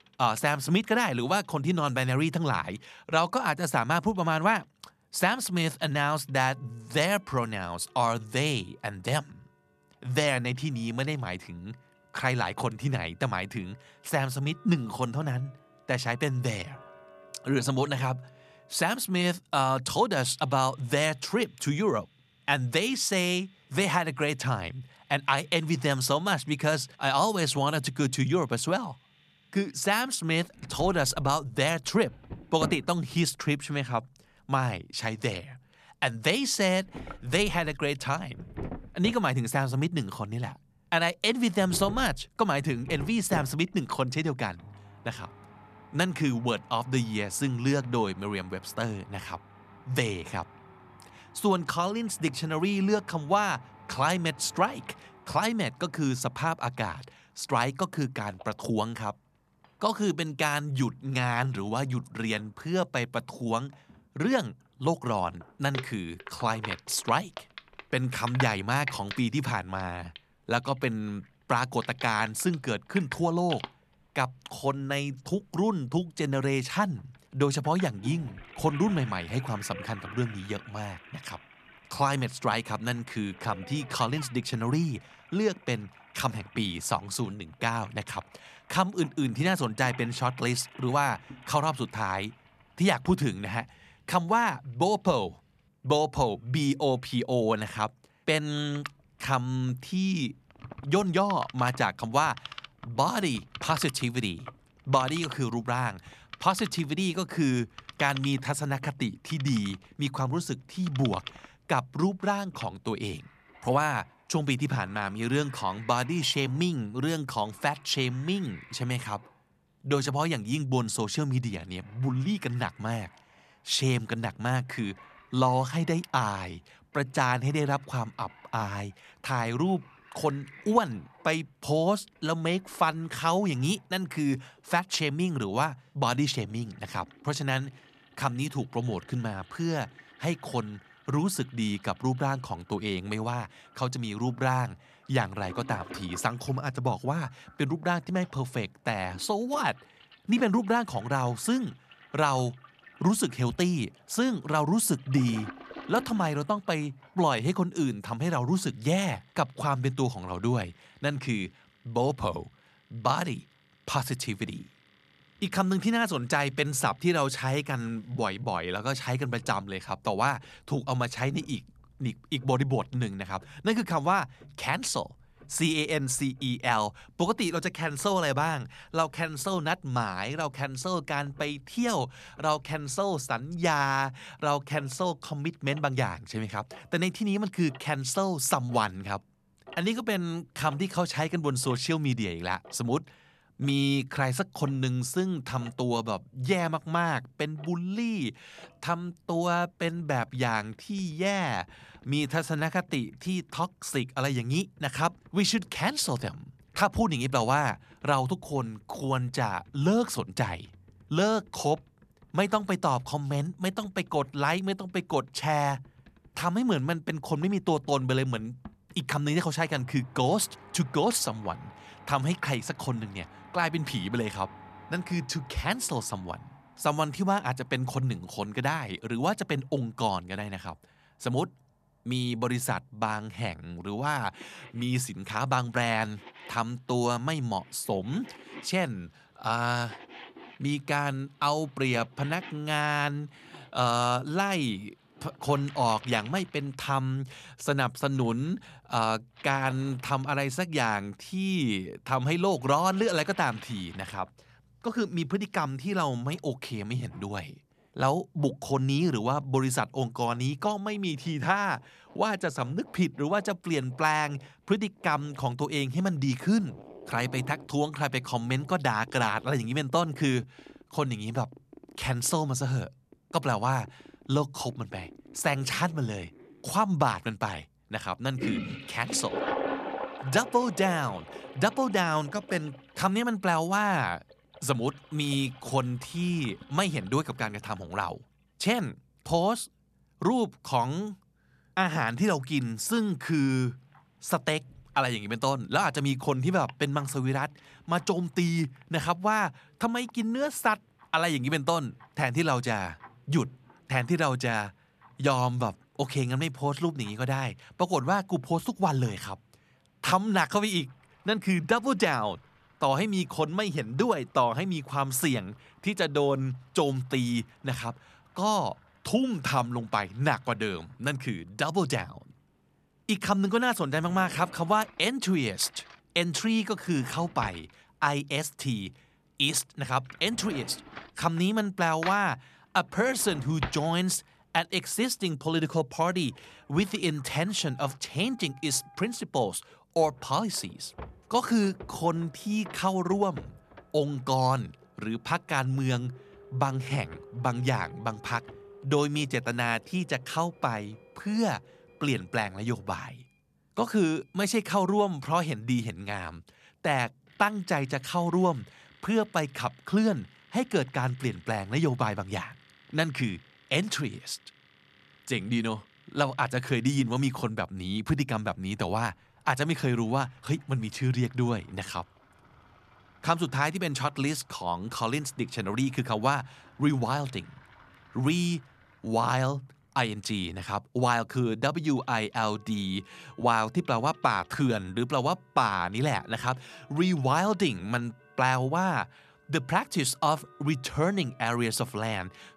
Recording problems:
household noises; noticeable; throughout; 20 dB below the speech

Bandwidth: 14 kHz